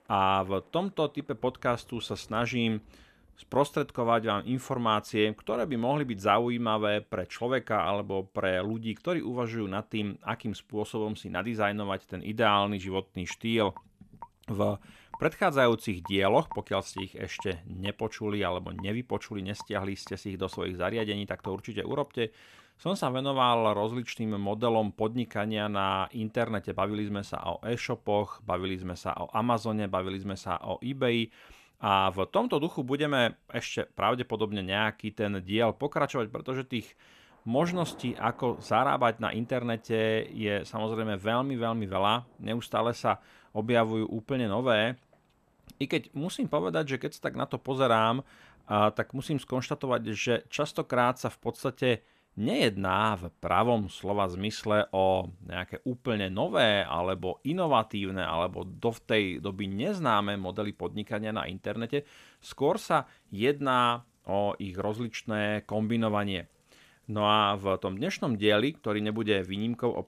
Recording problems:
rain or running water; faint; throughout; 25 dB below the speech

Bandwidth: 14.5 kHz